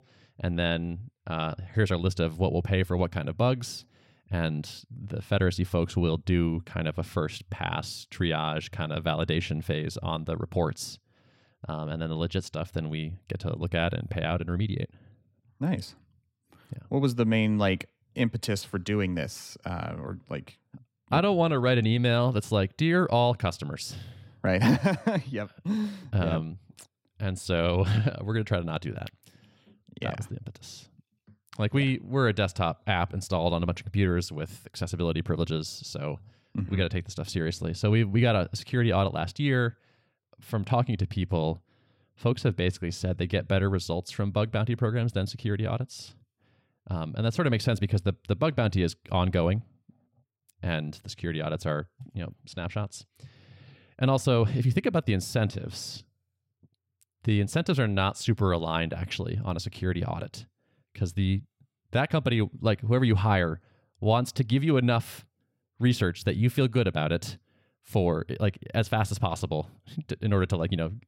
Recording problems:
none

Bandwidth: 16 kHz